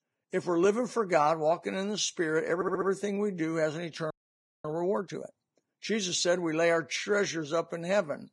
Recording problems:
garbled, watery; badly
audio stuttering; at 2.5 s
audio freezing; at 4 s for 0.5 s

